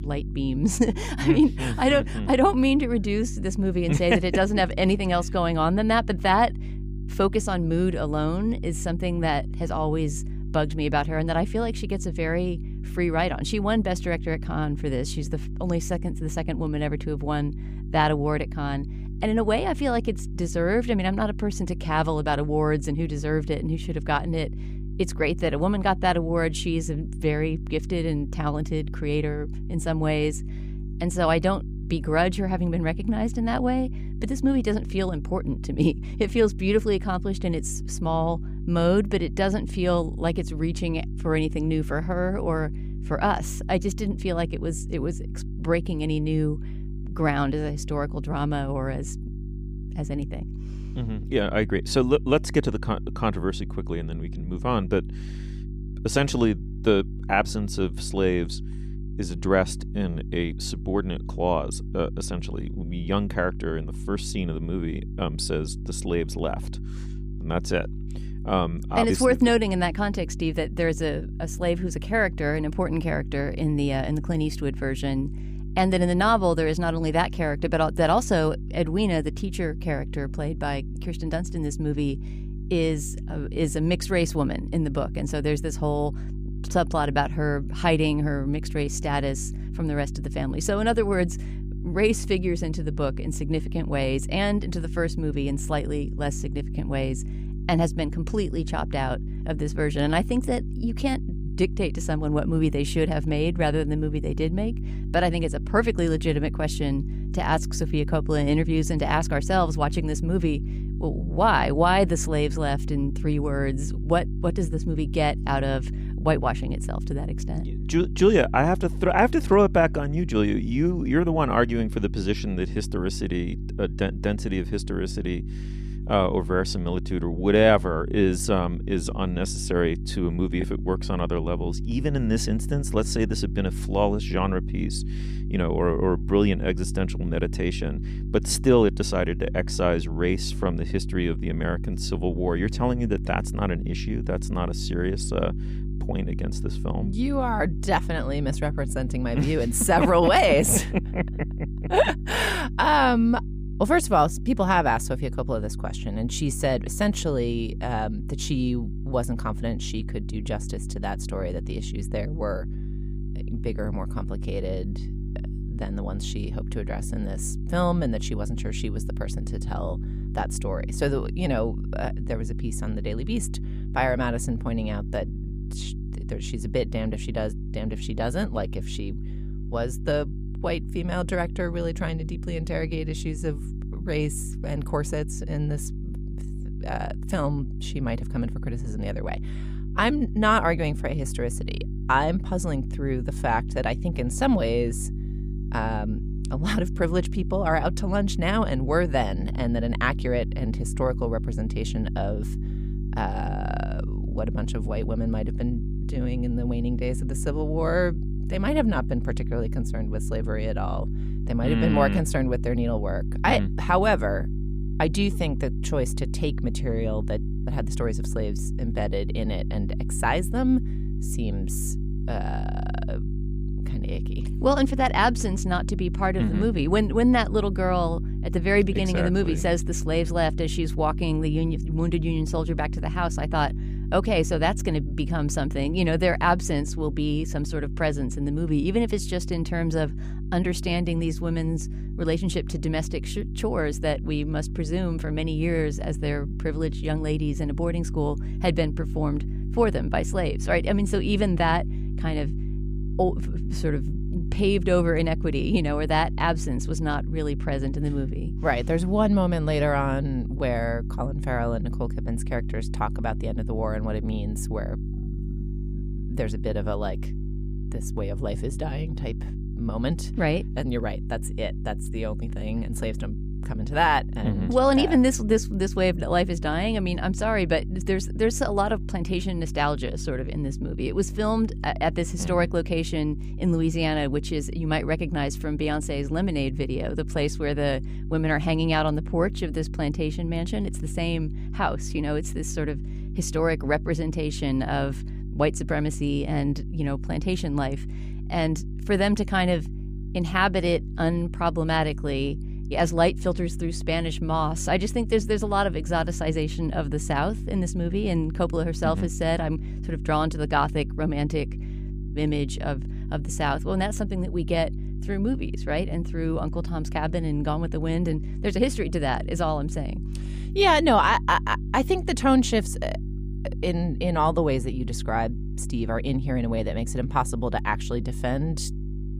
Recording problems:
electrical hum; noticeable; throughout; 50 Hz, 15 dB below the speech

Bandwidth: 15 kHz